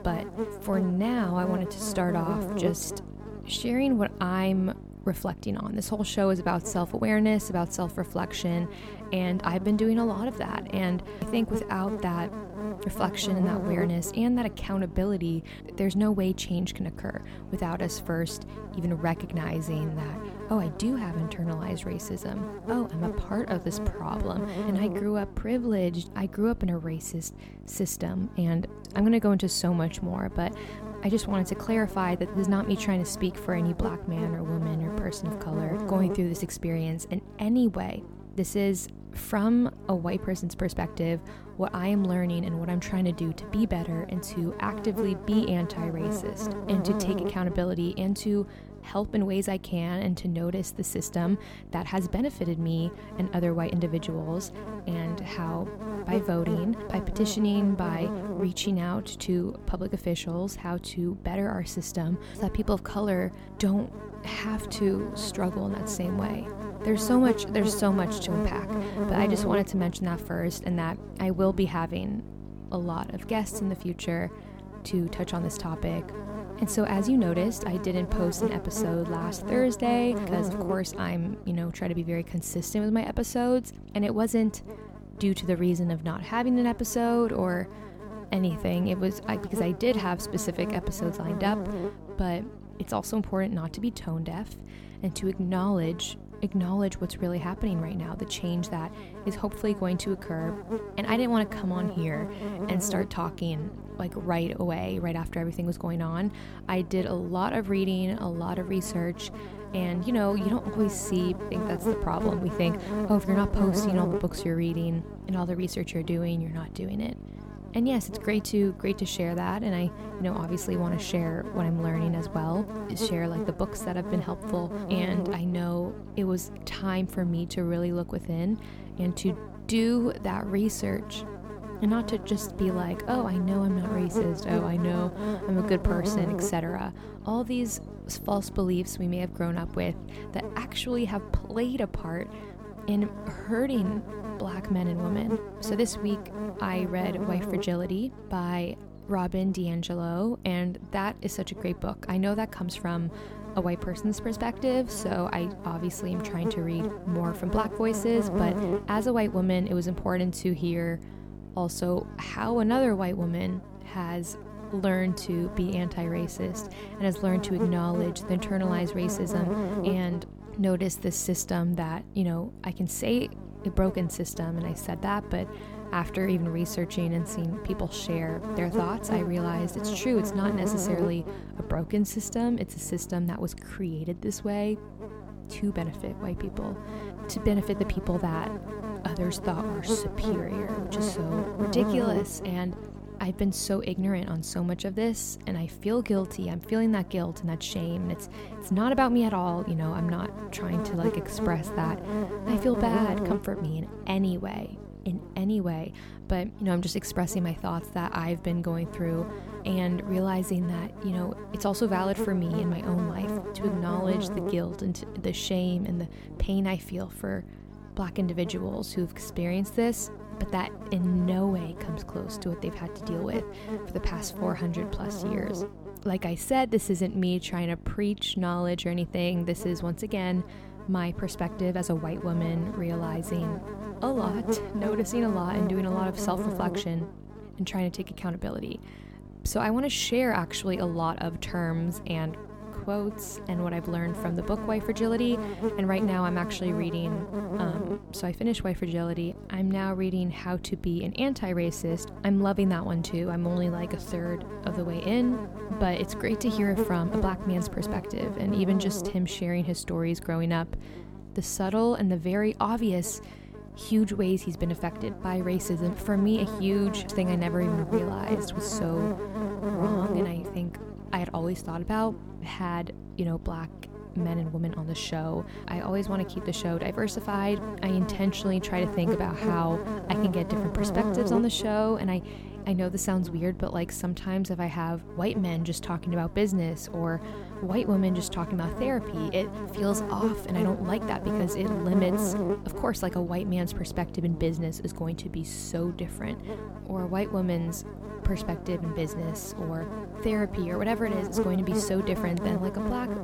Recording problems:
electrical hum; loud; throughout; 50 Hz, 6 dB below the speech

